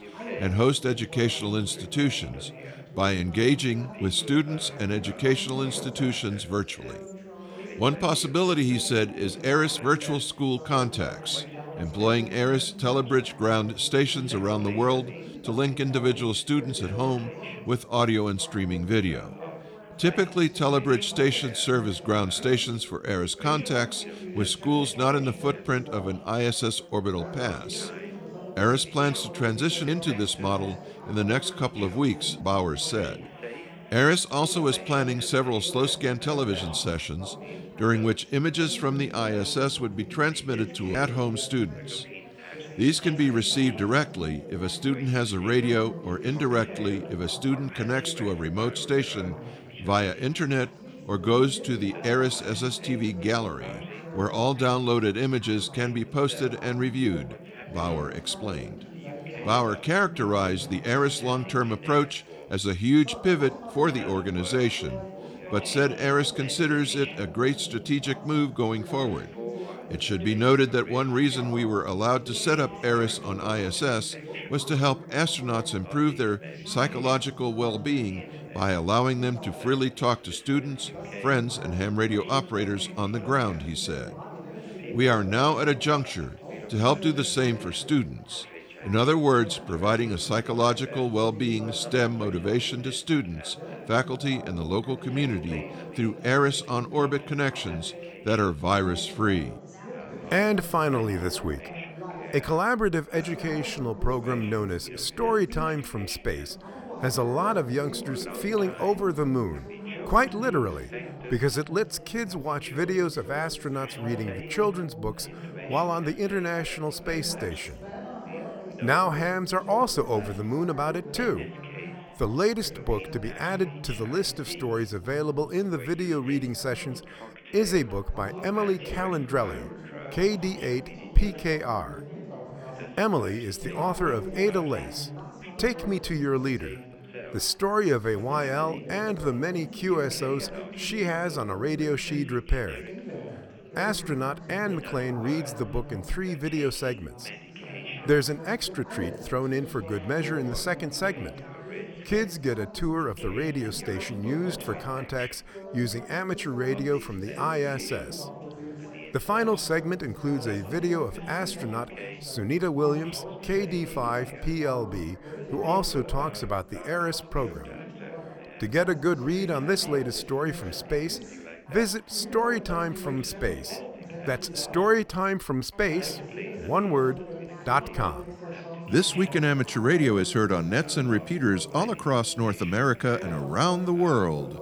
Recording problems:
background chatter; noticeable; throughout; 3 voices, 15 dB below the speech

